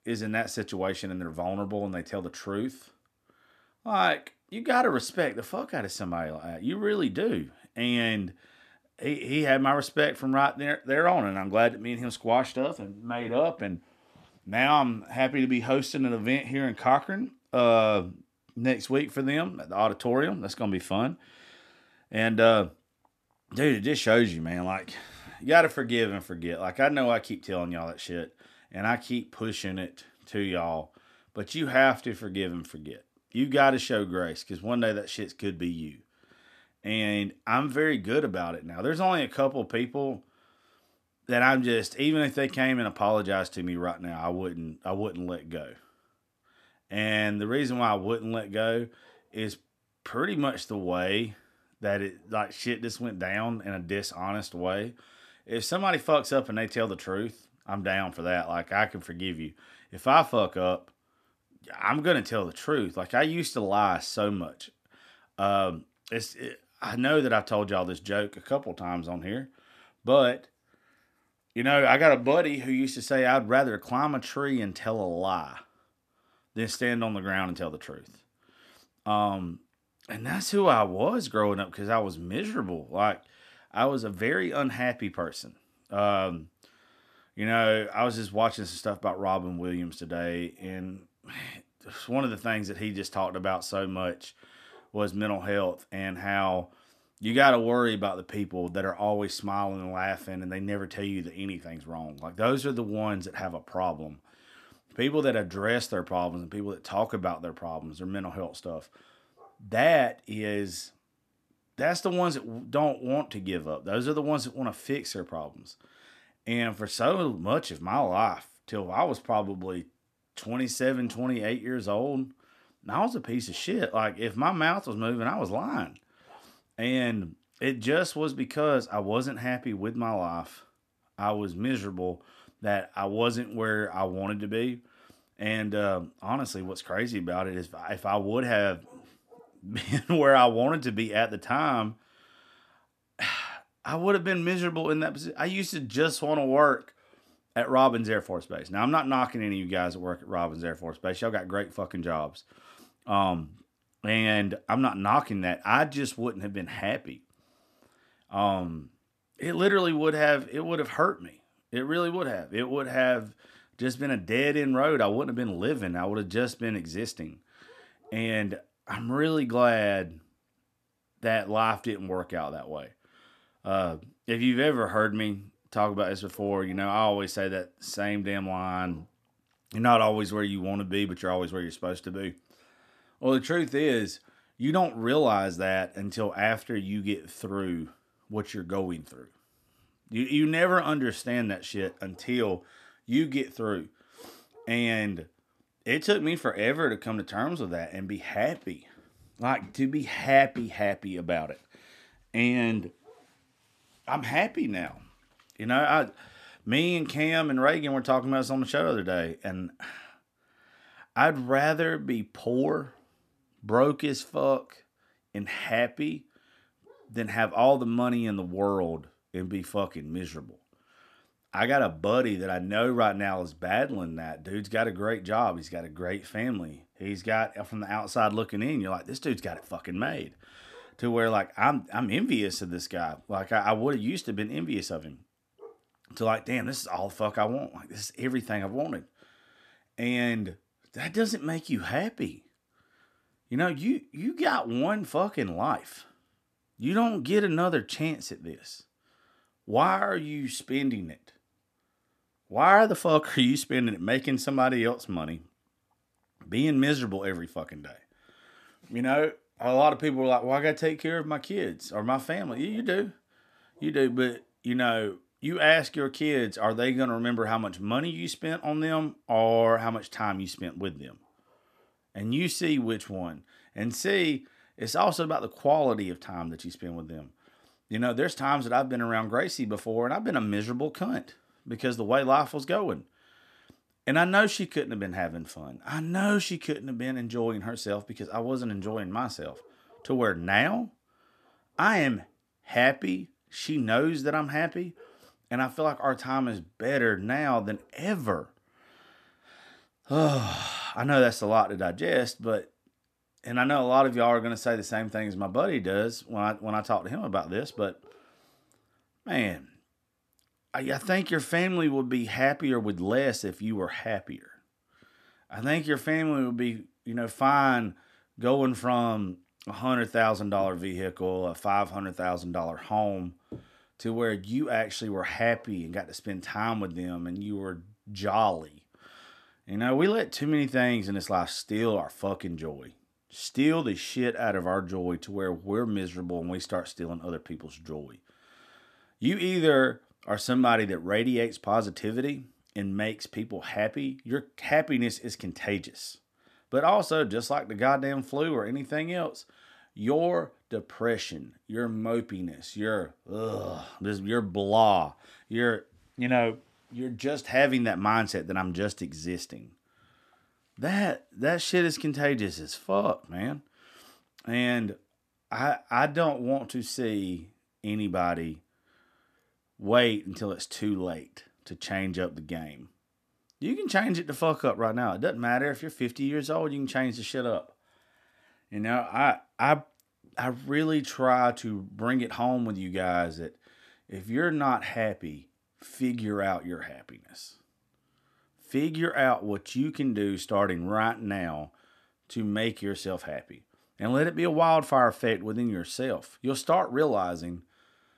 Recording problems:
none

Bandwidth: 14.5 kHz